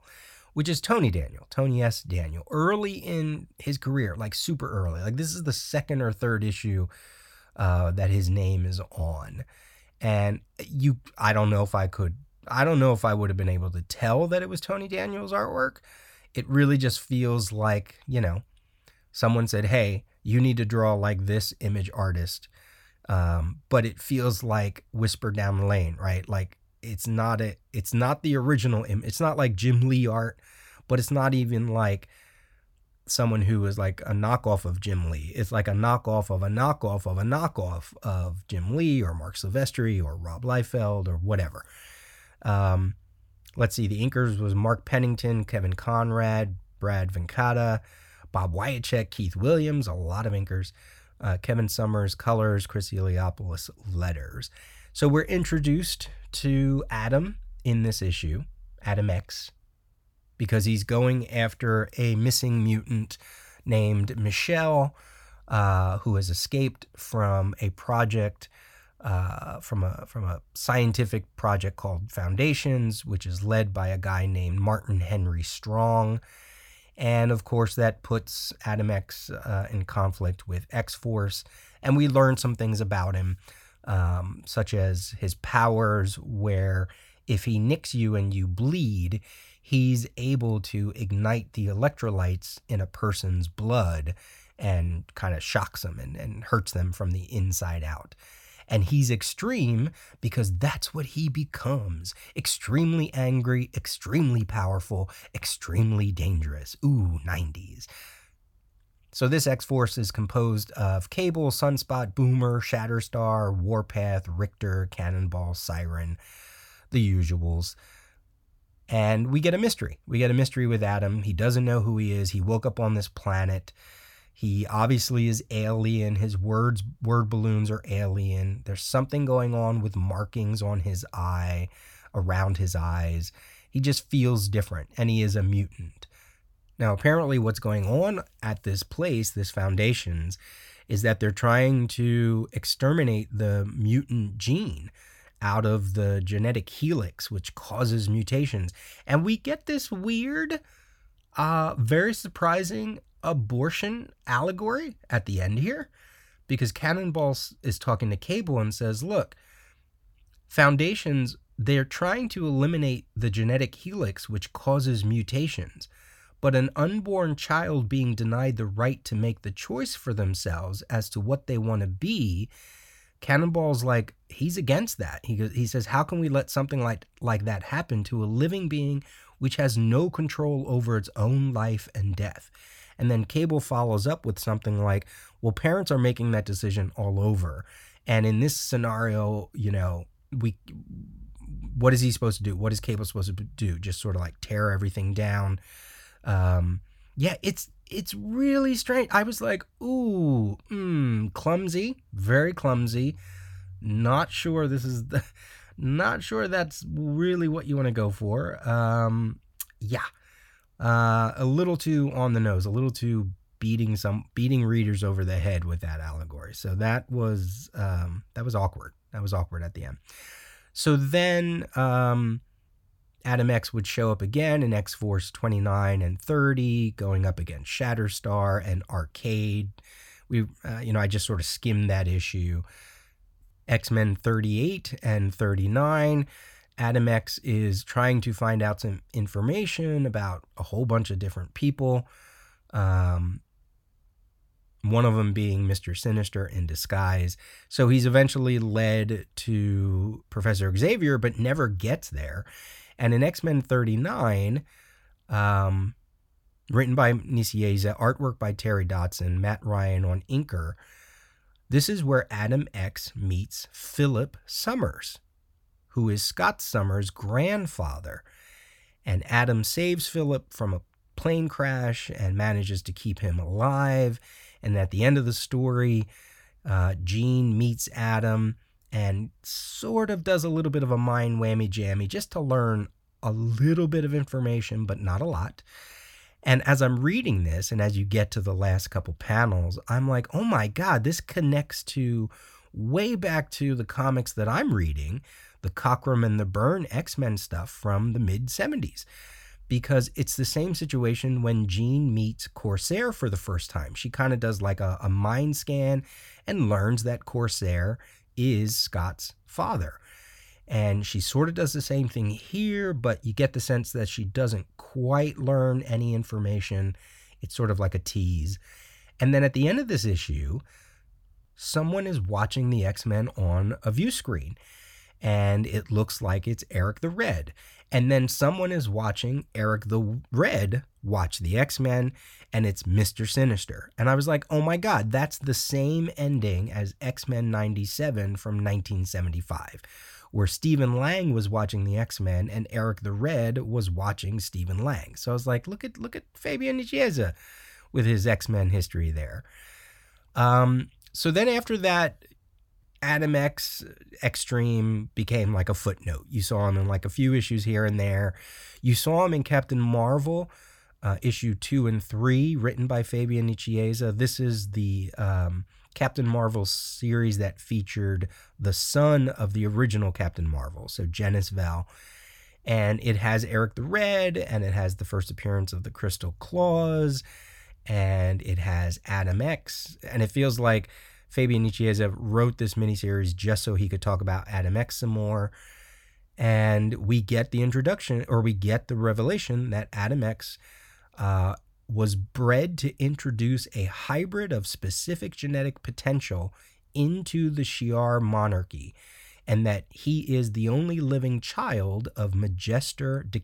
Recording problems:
none

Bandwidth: 18.5 kHz